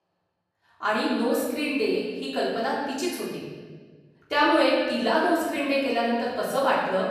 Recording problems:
room echo; strong; dies away in 1.5 s
off-mic speech; far
echo of what is said; faint; throughout; 220 ms later, 20 dB below the speech

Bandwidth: 14.5 kHz